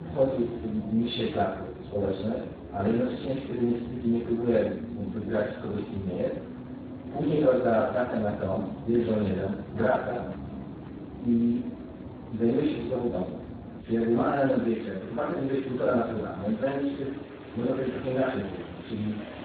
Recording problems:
room echo; strong; dies away in 0.7 s
off-mic speech; far
garbled, watery; badly
traffic noise; noticeable; throughout; 10 dB below the speech

